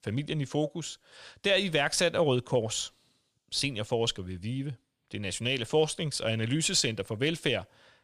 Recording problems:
none

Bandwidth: 15 kHz